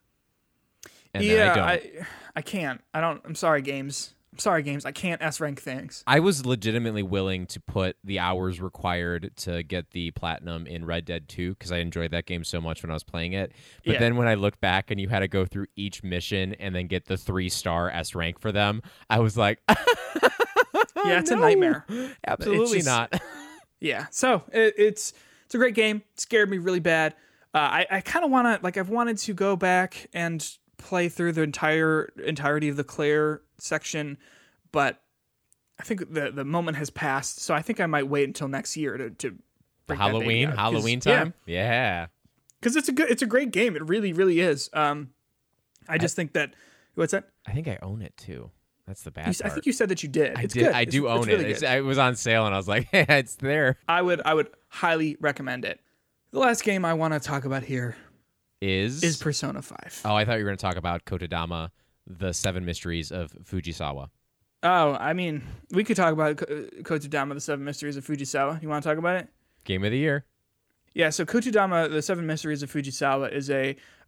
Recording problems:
none

